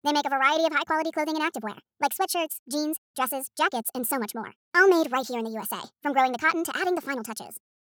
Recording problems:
wrong speed and pitch; too fast and too high; 1.5 times normal speed

